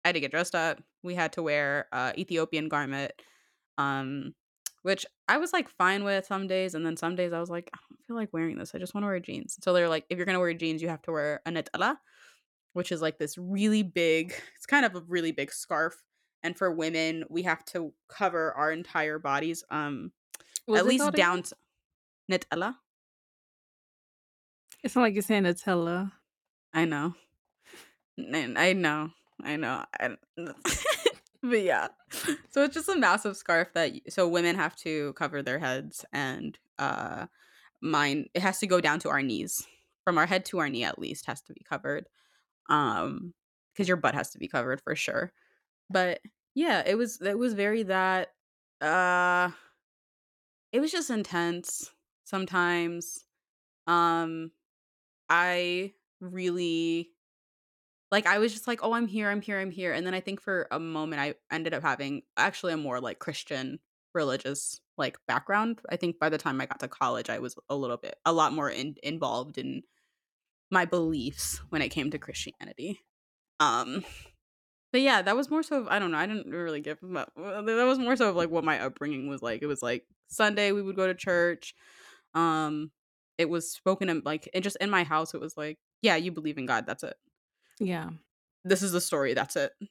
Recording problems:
none

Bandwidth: 17 kHz